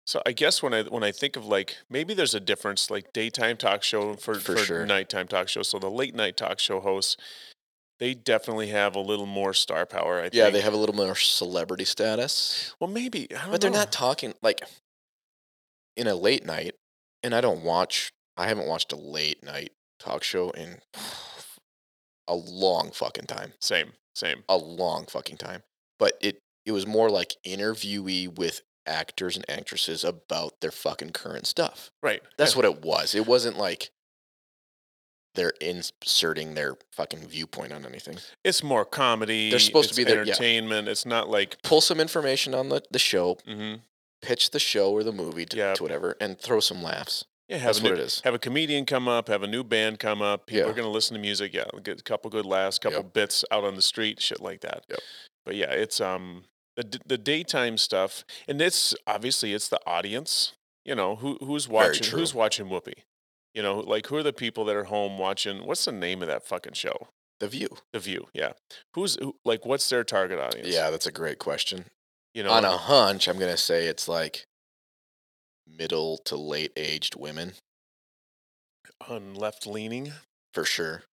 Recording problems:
thin; somewhat; fading below 350 Hz

